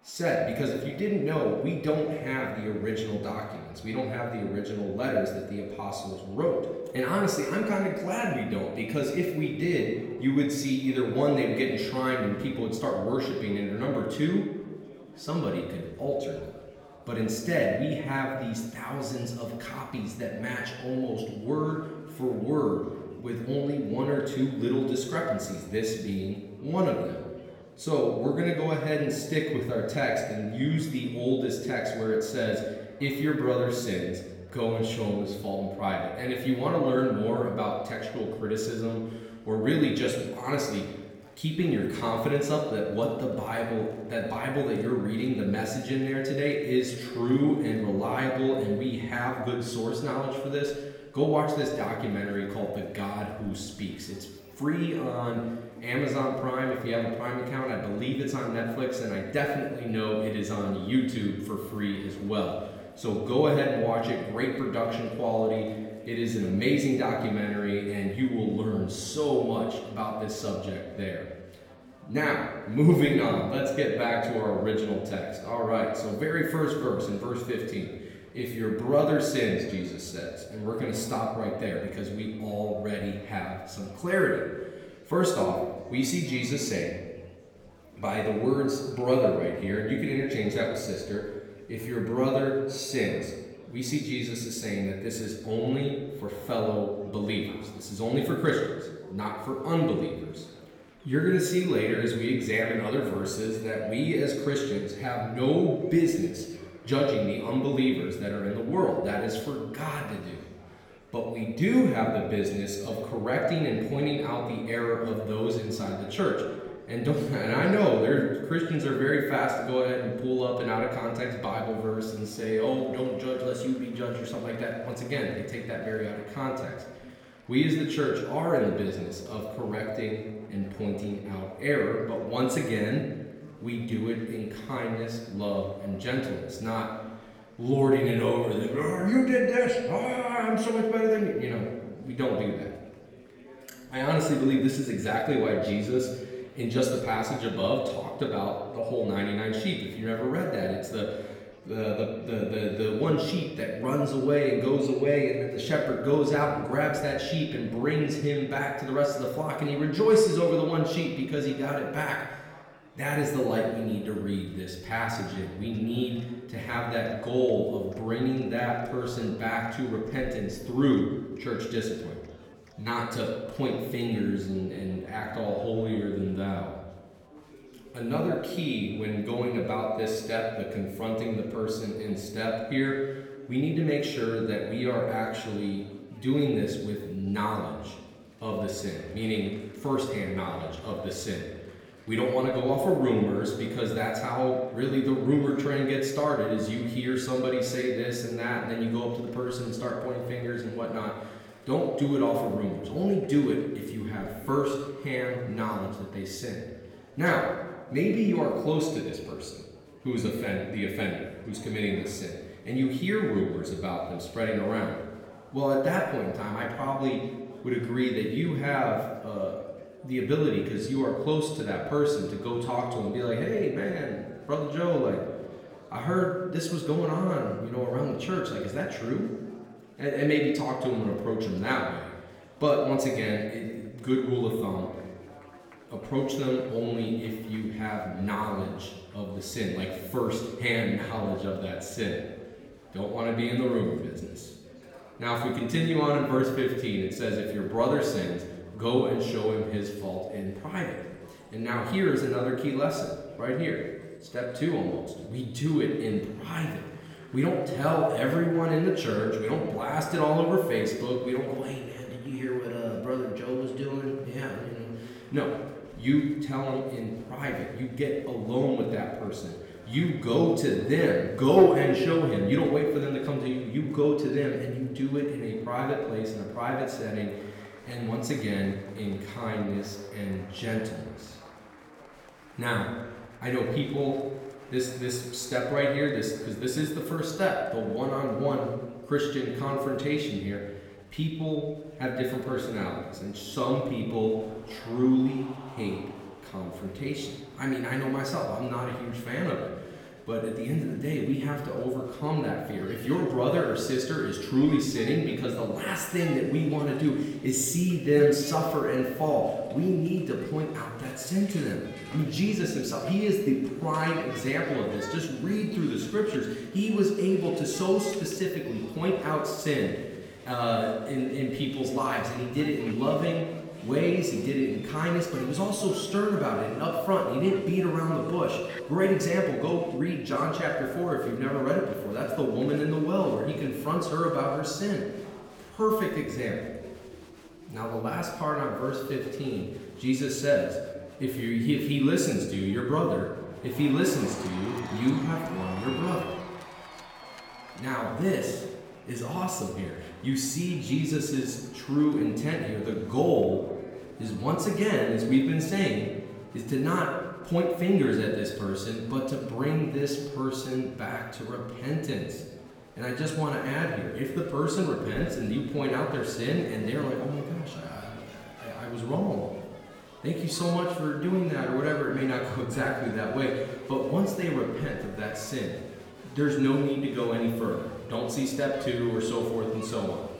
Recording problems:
off-mic speech; far
room echo; noticeable; dies away in 1 s
murmuring crowd; faint; throughout; 20 dB below the speech

